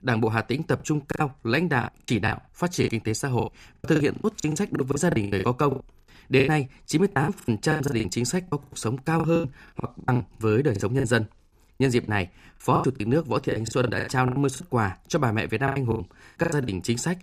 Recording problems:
choppy; very; 19% of the speech affected

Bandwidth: 15 kHz